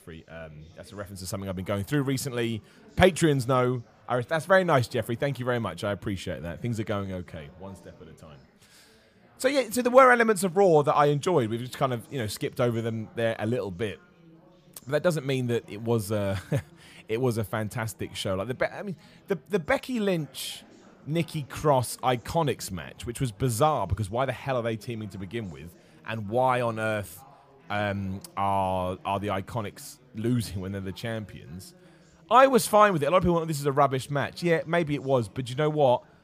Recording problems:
chatter from many people; faint; throughout; 30 dB below the speech

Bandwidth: 15 kHz